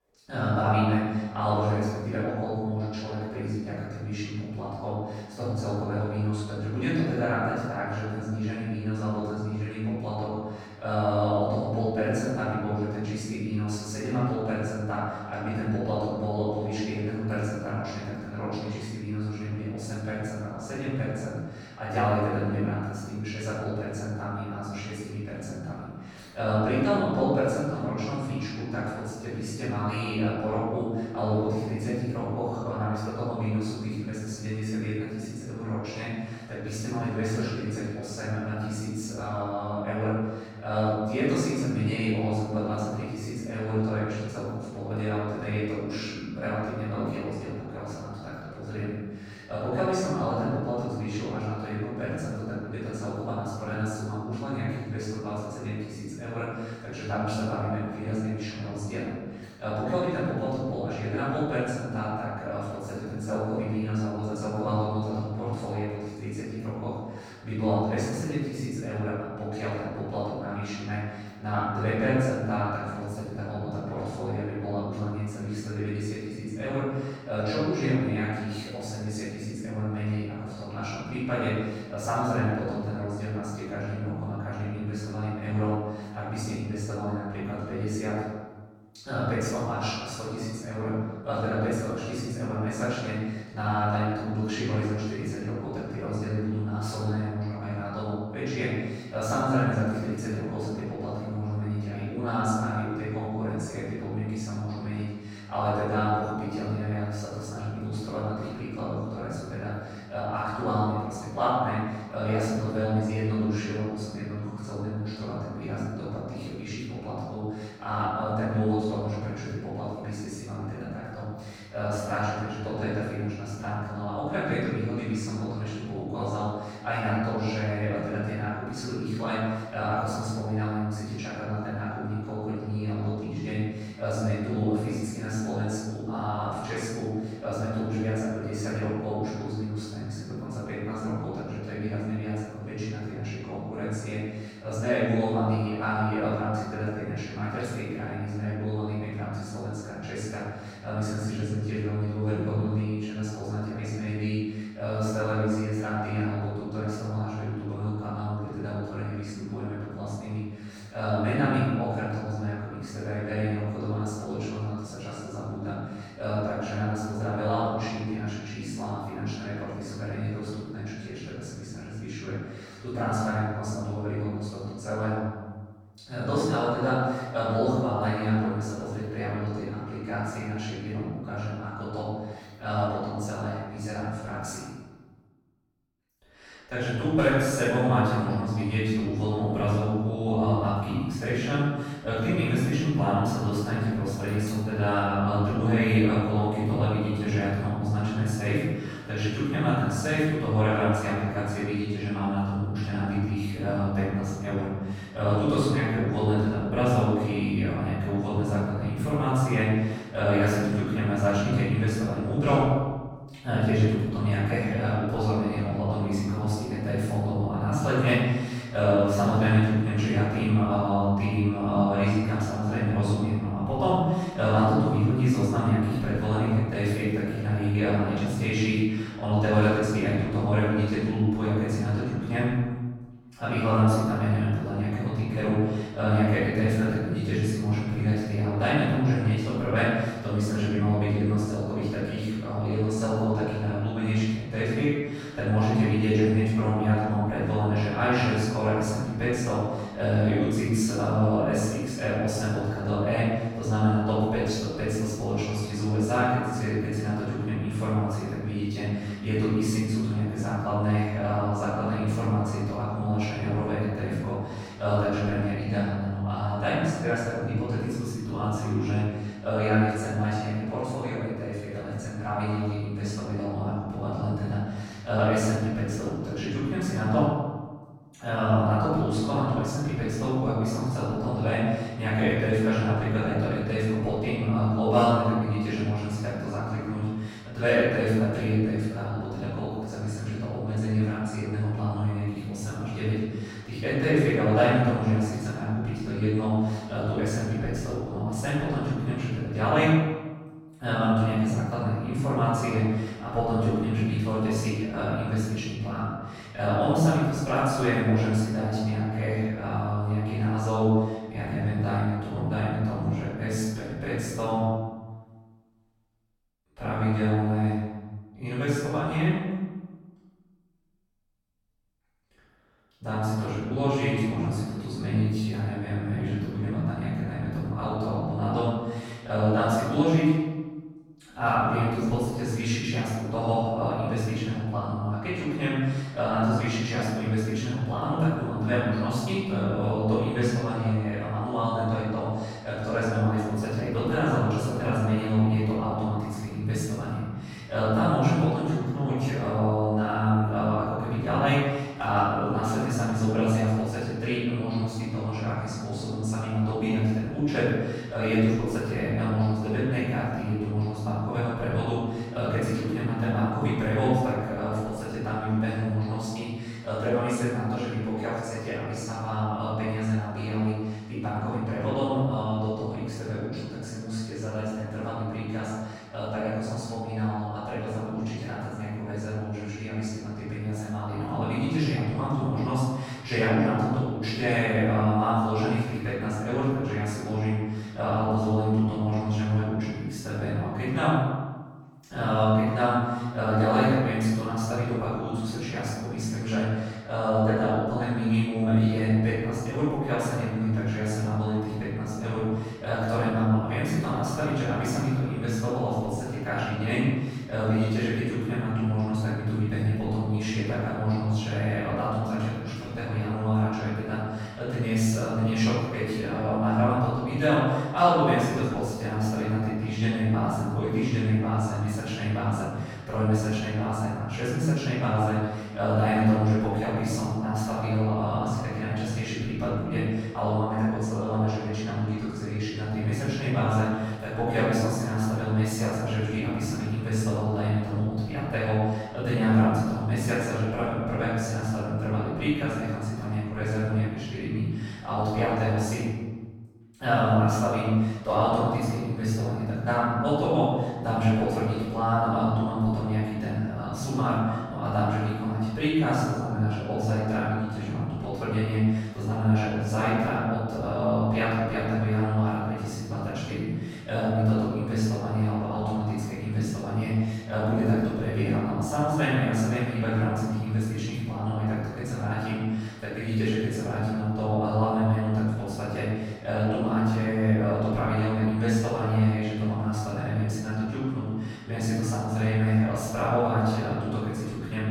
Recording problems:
room echo; strong; dies away in 1.2 s
off-mic speech; far

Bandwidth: 18 kHz